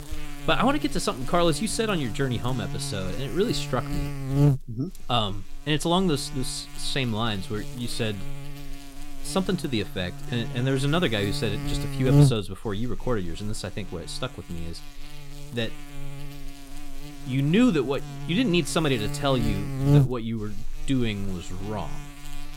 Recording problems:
electrical hum; loud; throughout; 50 Hz, 9 dB below the speech

